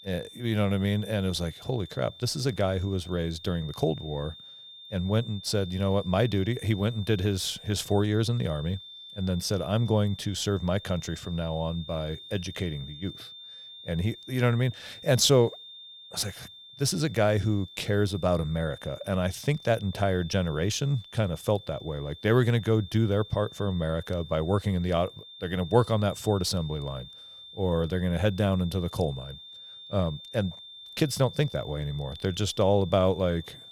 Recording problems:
high-pitched whine; noticeable; throughout; 3.5 kHz, 15 dB below the speech

